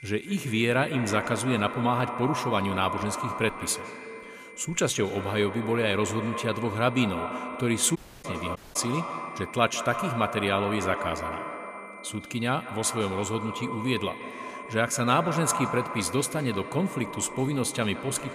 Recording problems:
echo of what is said; strong; throughout; 160 ms later, 8 dB below the speech
high-pitched whine; noticeable; throughout; 2 kHz, 20 dB below the speech
audio cutting out; at 8 s and at 8.5 s

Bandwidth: 15 kHz